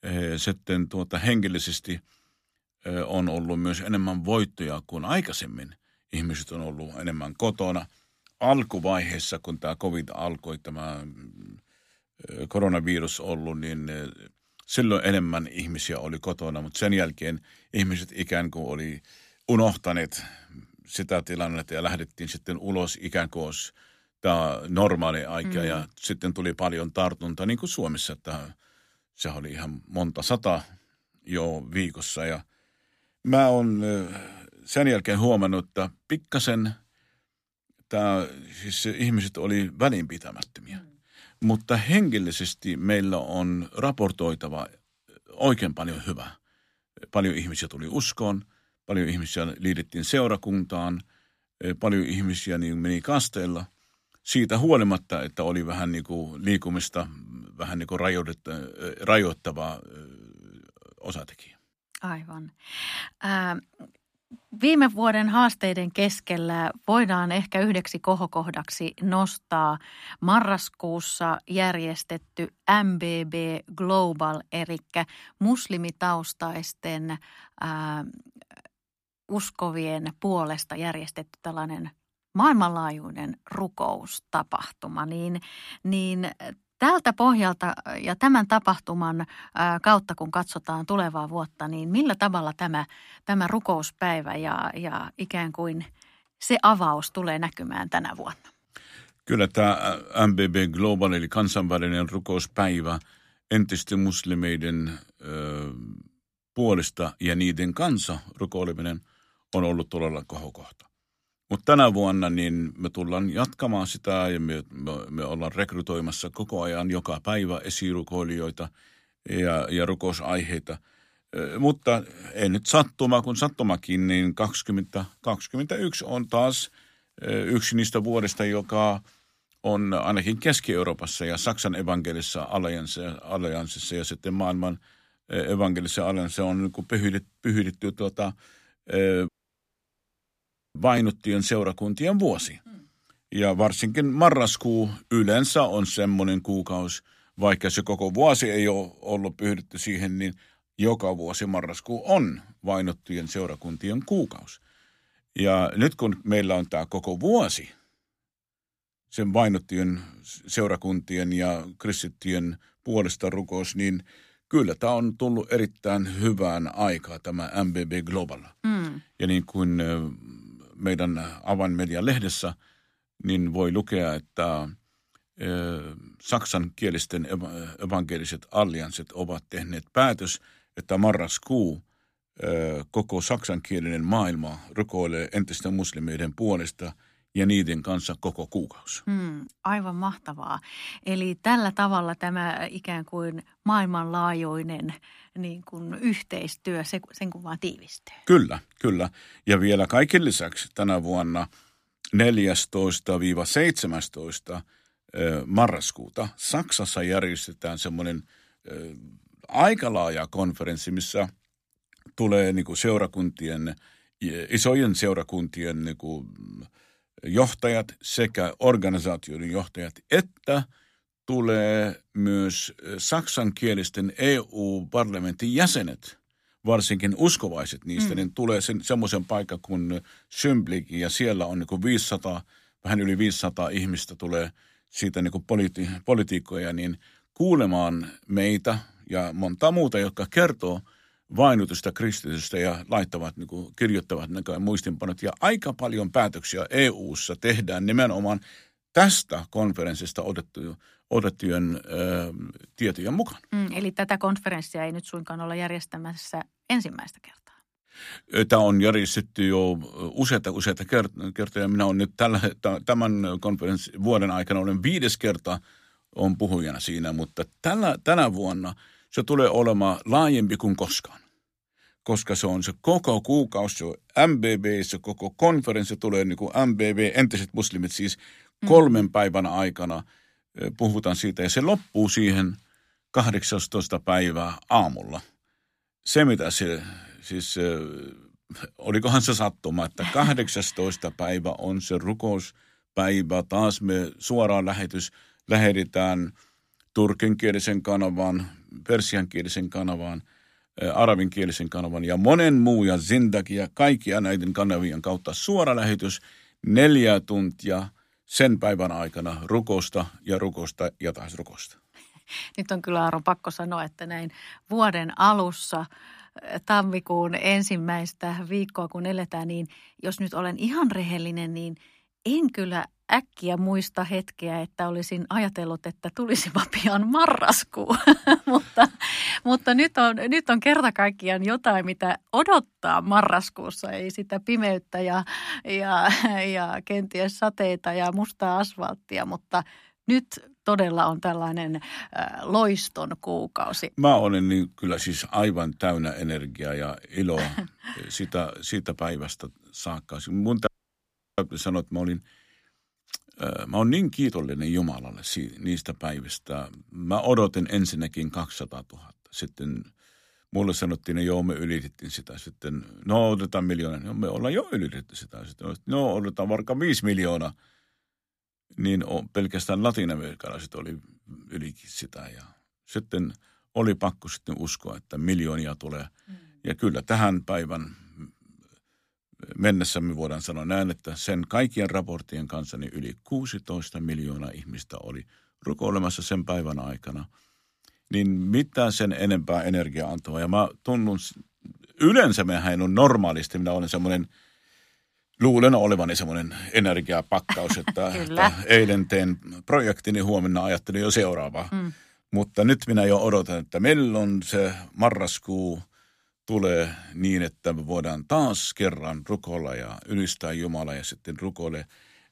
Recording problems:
audio cutting out; at 2:19 for 1.5 s and at 5:51 for 0.5 s

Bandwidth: 15 kHz